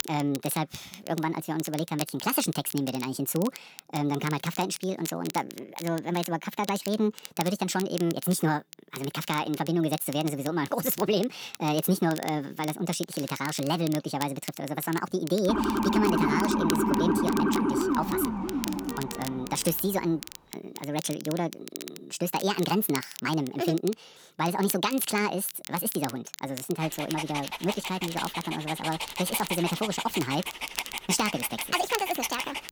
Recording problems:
wrong speed and pitch; too fast and too high; 1.6 times normal speed
crackle, like an old record; noticeable; 10 dB below the speech
siren; loud; from 15 to 20 s; peak 4 dB above the speech
dog barking; noticeable; from 27 s on; peak 3 dB below the speech

